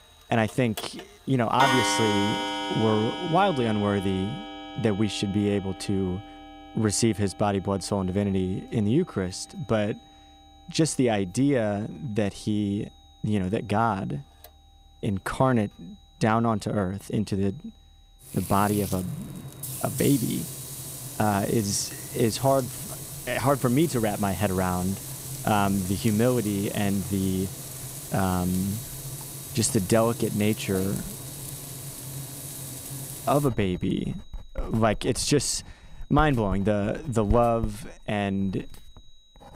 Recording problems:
household noises; loud; throughout; 8 dB below the speech
high-pitched whine; faint; throughout; 4 kHz, 30 dB below the speech

